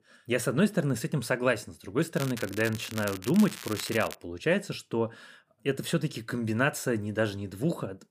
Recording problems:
crackling; noticeable; from 2 to 4 s; 10 dB below the speech

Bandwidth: 15 kHz